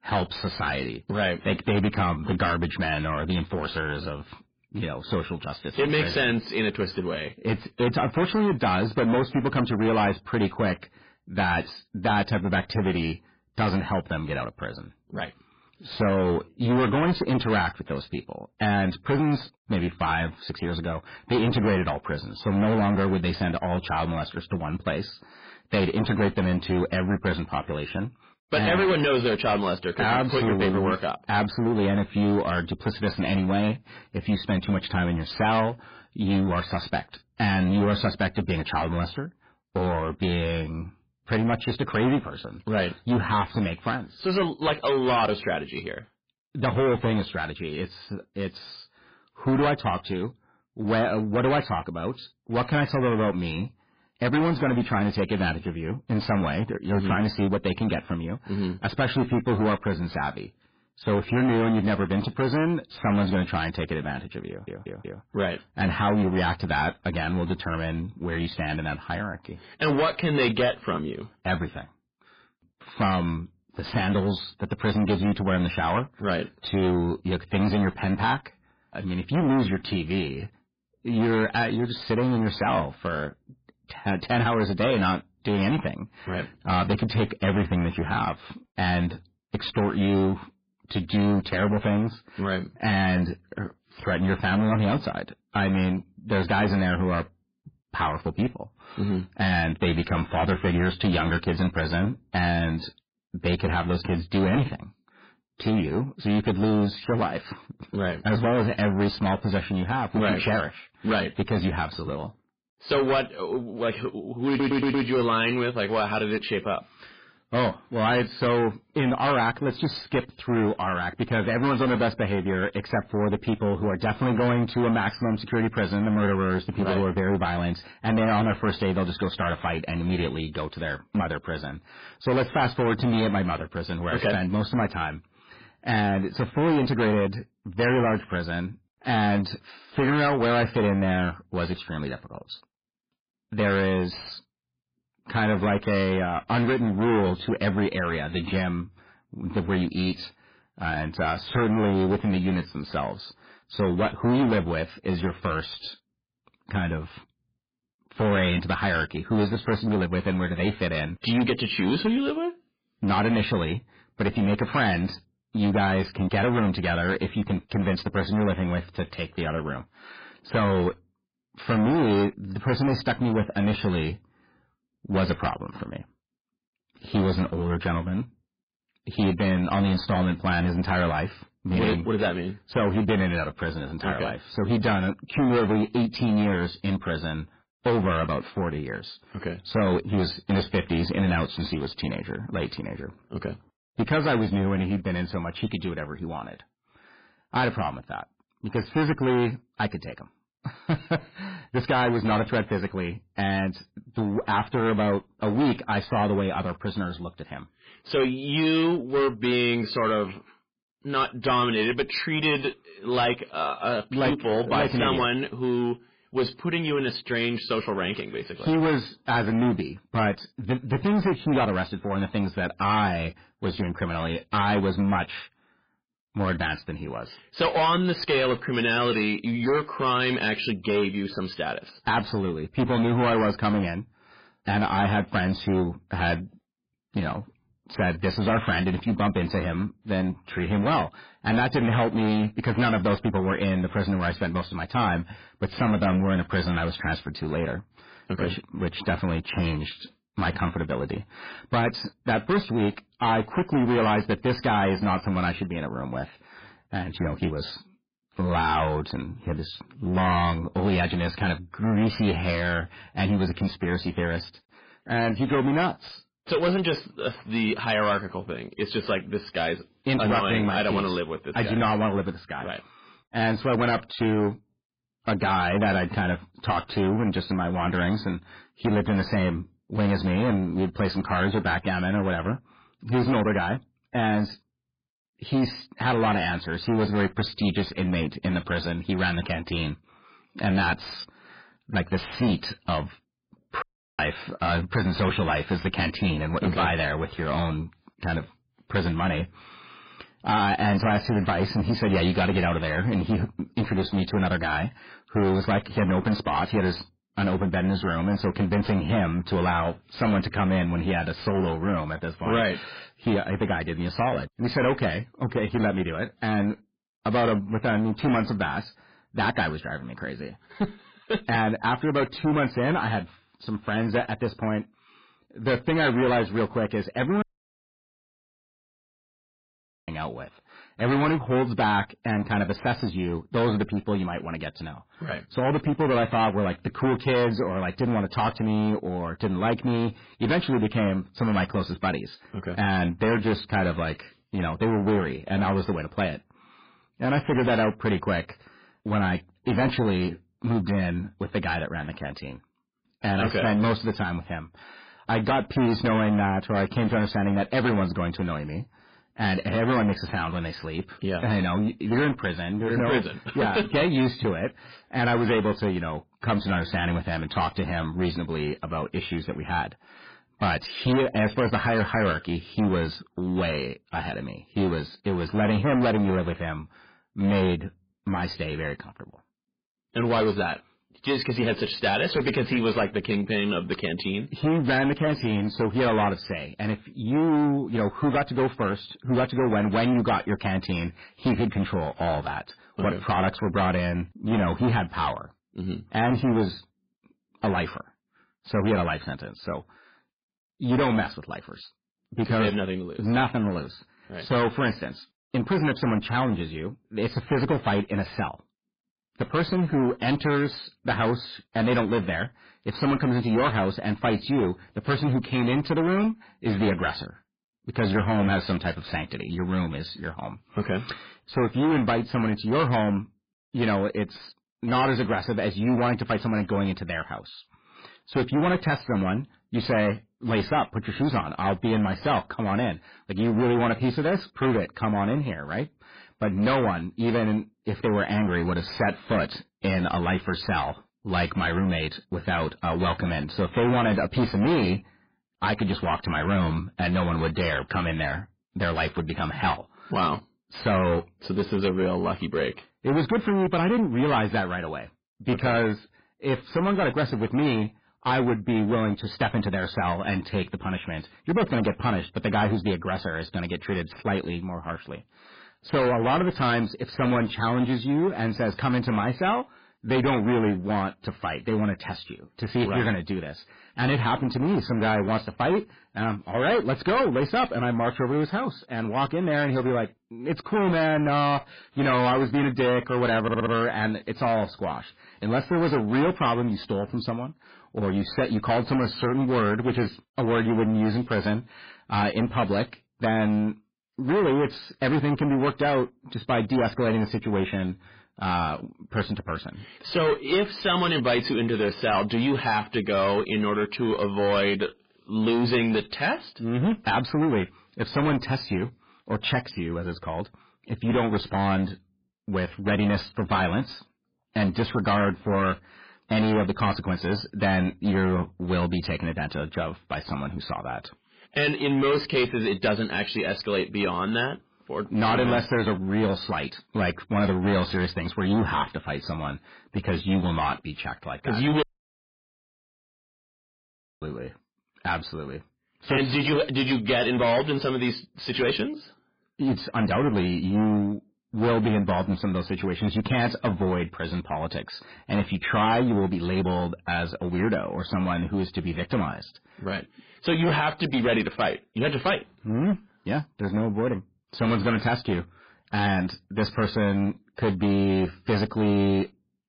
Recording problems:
distortion; heavy; 13% of the sound clipped
garbled, watery; badly
audio stuttering; at 1:04, at 1:54 and at 8:03
audio cutting out; at 4:54, at 5:27 for 2.5 s and at 8:52 for 2.5 s

